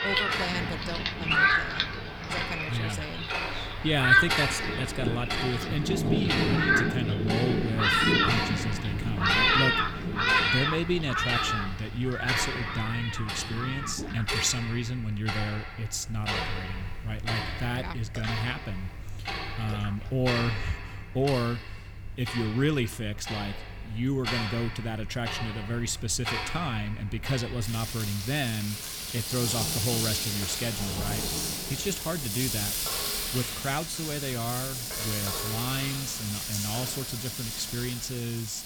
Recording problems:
rain or running water; very loud; throughout; 4 dB above the speech
household noises; loud; throughout; 1 dB below the speech

